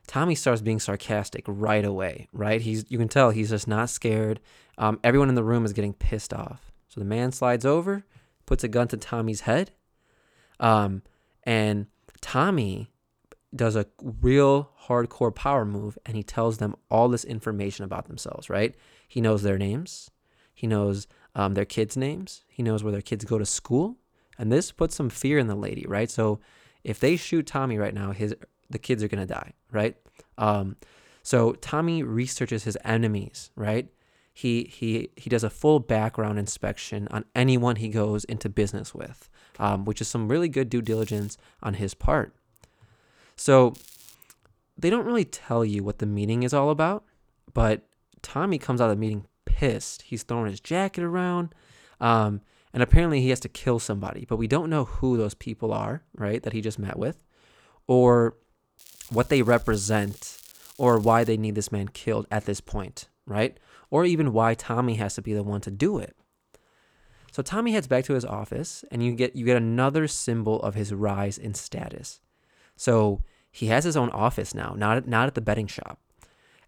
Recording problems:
crackling; faint; 4 times, first at 27 s; 20 dB below the speech

